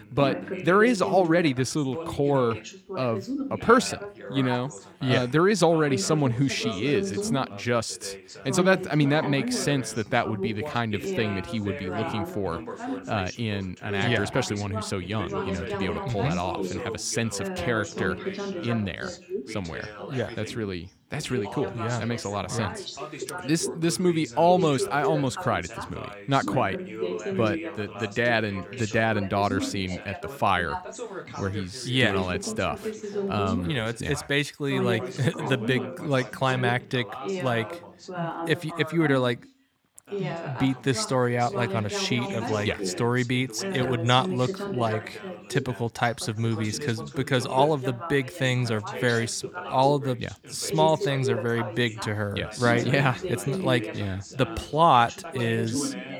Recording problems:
background chatter; loud; throughout; 2 voices, 8 dB below the speech

